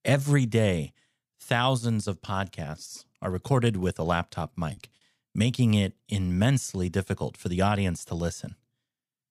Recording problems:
choppy; occasionally; at 4.5 s; 4% of the speech affected

